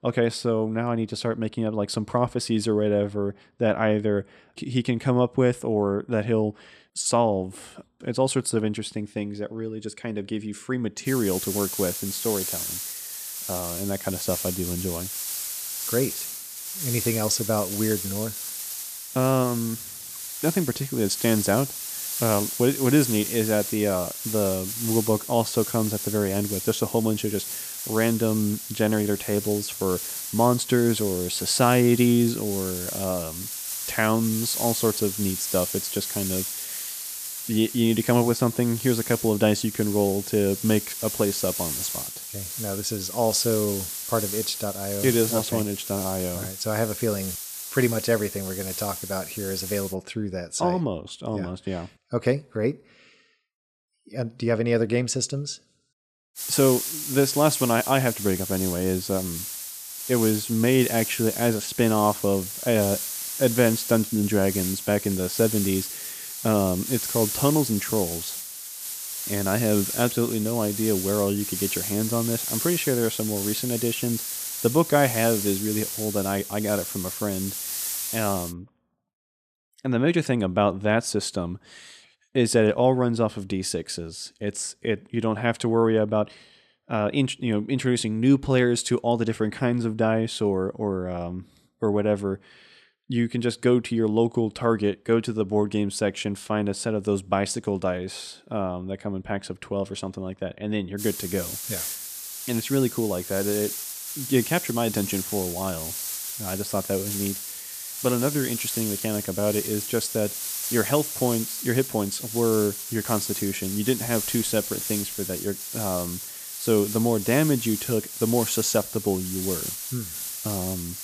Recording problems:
hiss; loud; from 11 to 50 s, from 56 s to 1:19 and from 1:41 on; 5 dB below the speech

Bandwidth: 14.5 kHz